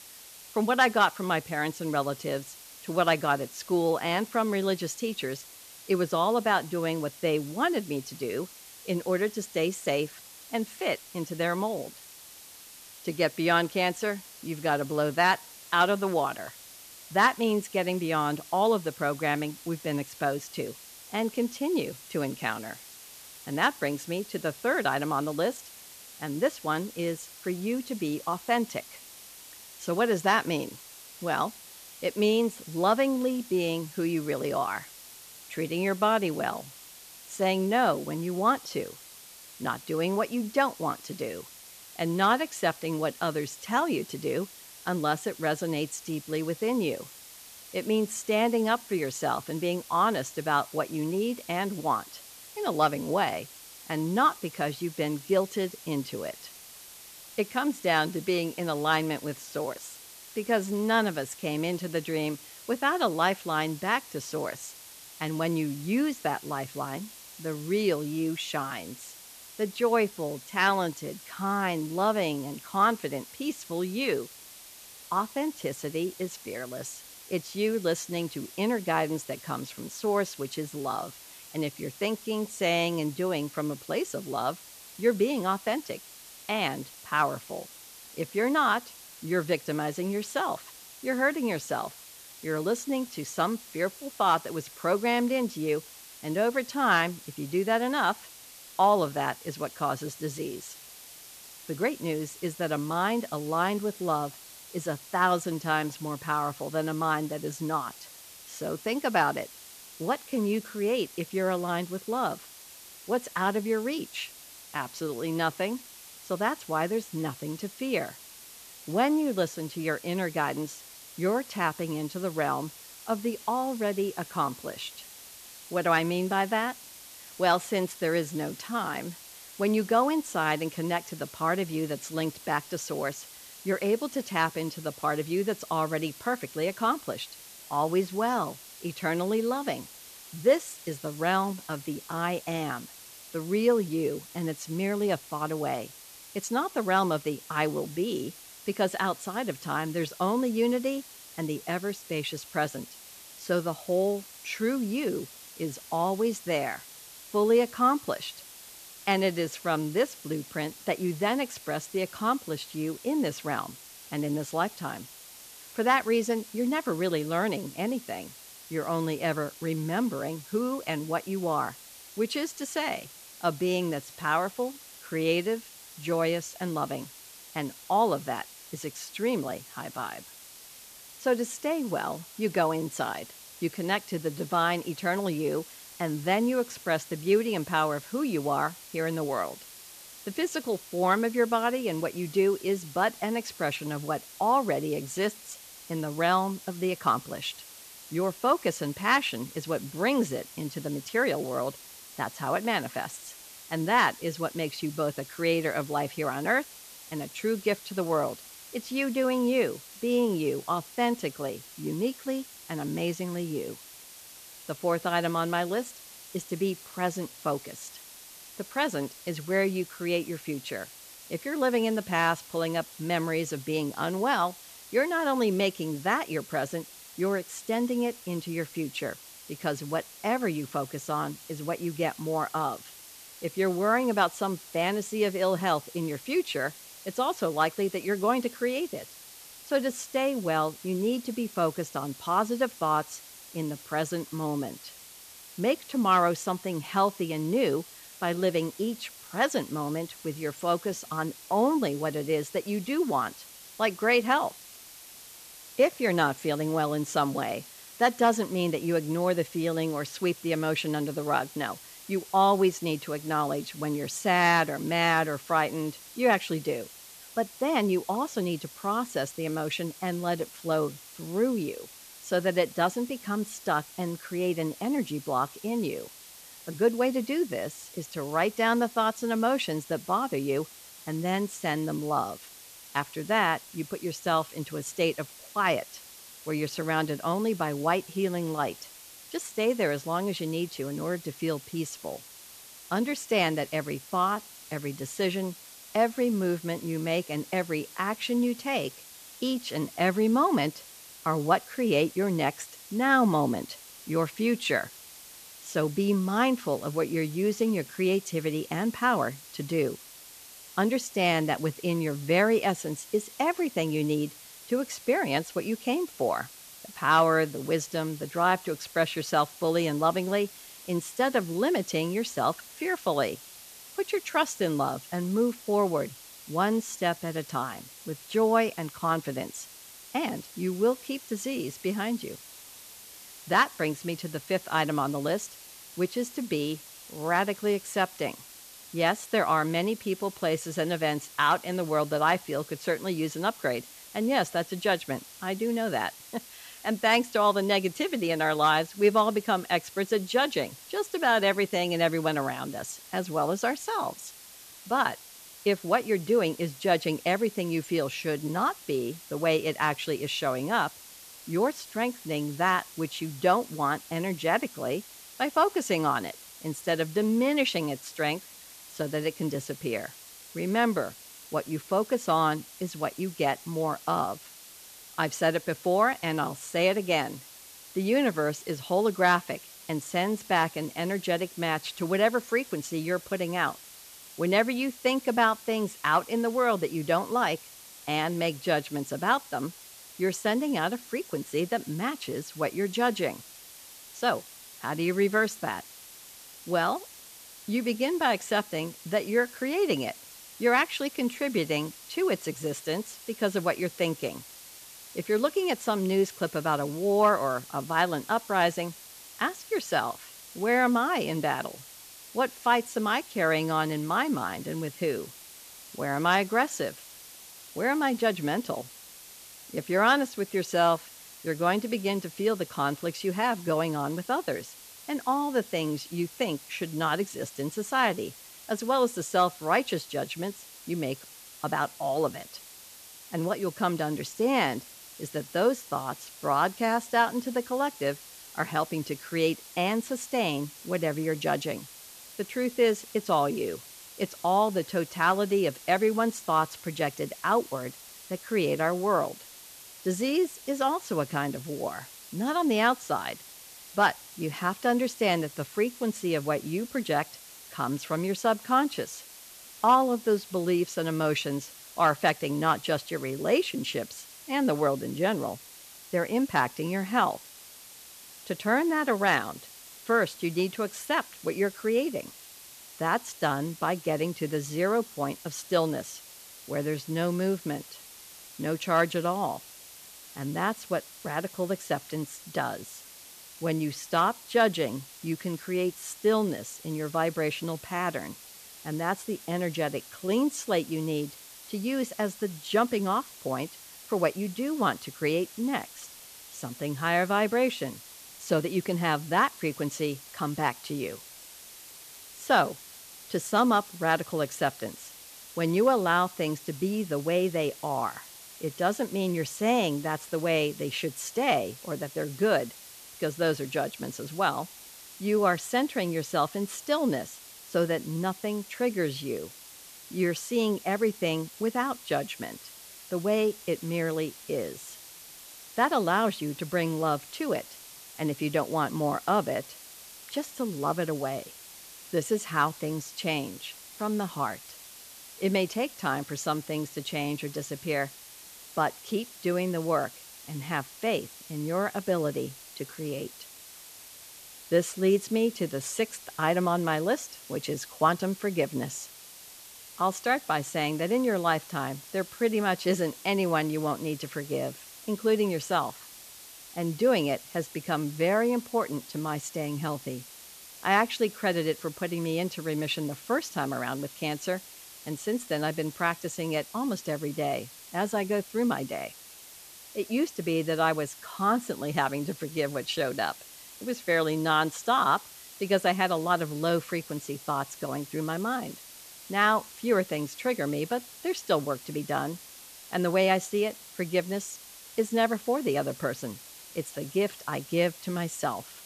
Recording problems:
hiss; noticeable; throughout; 15 dB below the speech

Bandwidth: 14.5 kHz